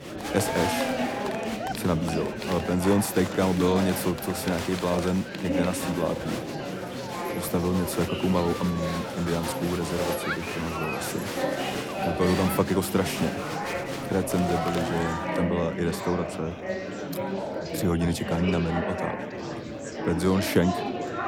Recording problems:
murmuring crowd; loud; throughout; 3 dB below the speech
rain or running water; faint; throughout; 25 dB below the speech

